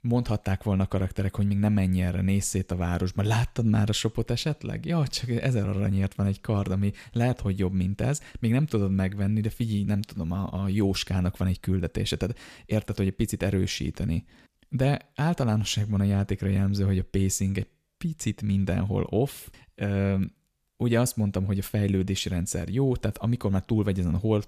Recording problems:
none

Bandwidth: 14.5 kHz